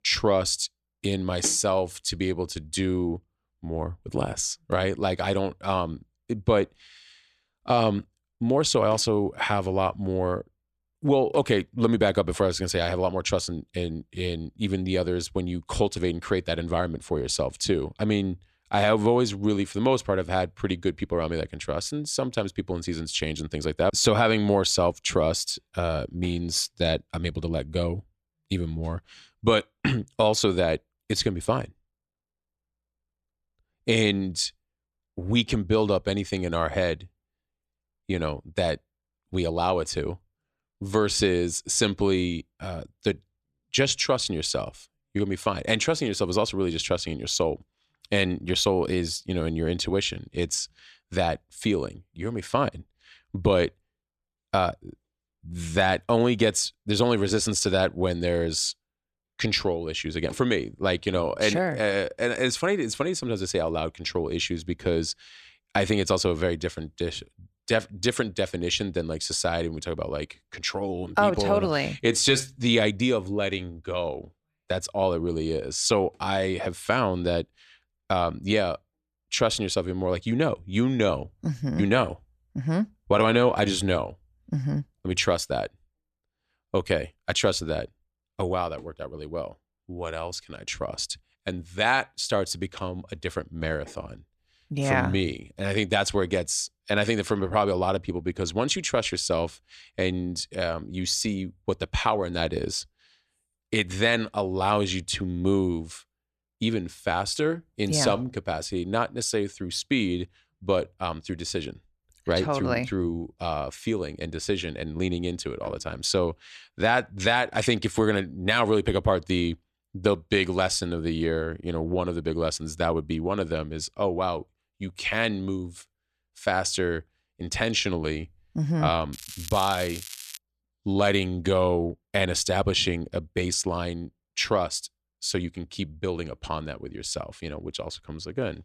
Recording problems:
crackling; noticeable; from 2:09 to 2:10; 10 dB below the speech

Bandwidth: 13.5 kHz